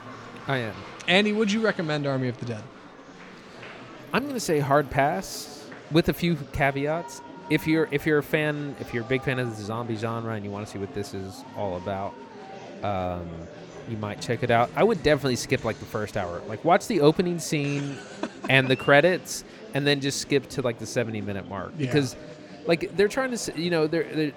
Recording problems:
murmuring crowd; noticeable; throughout; 15 dB below the speech
traffic noise; faint; until 5 s; 20 dB below the speech

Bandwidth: 19 kHz